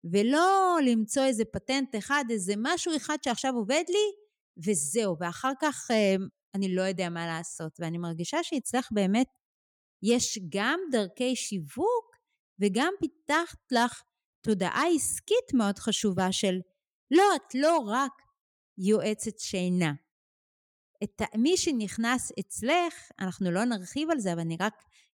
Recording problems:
none

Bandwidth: 18 kHz